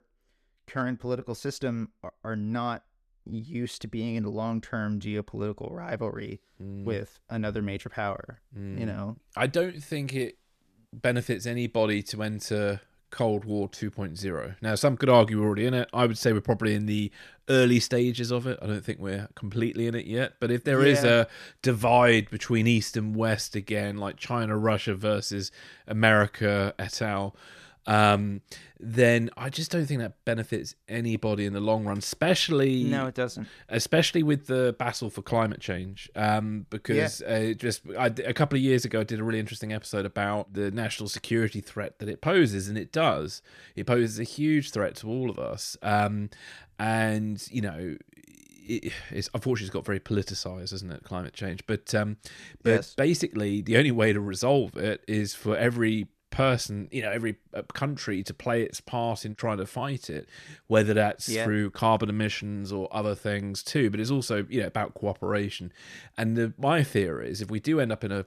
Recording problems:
none

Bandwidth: 14.5 kHz